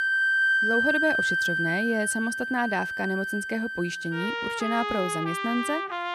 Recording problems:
background music; very loud; throughout; 3 dB above the speech

